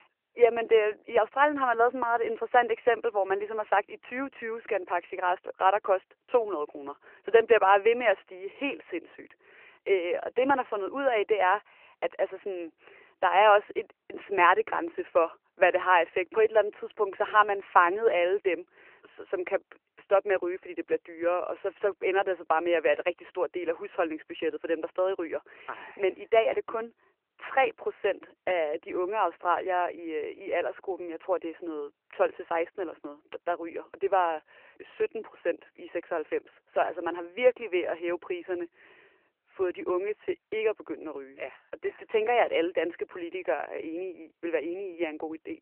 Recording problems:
phone-call audio; nothing above 3 kHz

